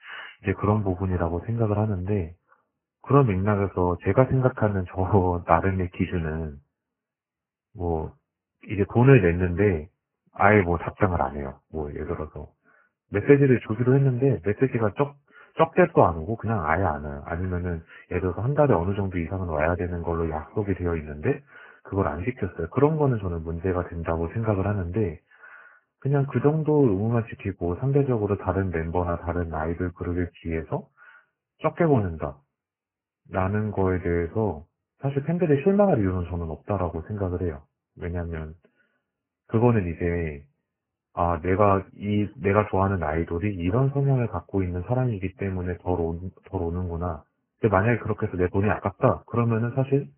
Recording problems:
garbled, watery; badly; nothing above 2.5 kHz

